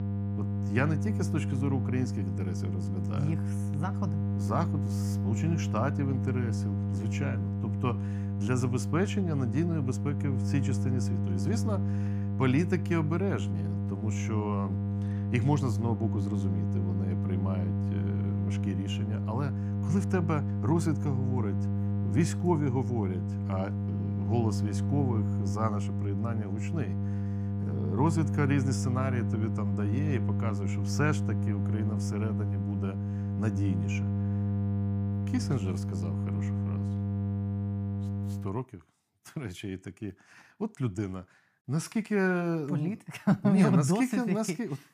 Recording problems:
electrical hum; loud; until 38 s; 50 Hz, 5 dB below the speech

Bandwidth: 15 kHz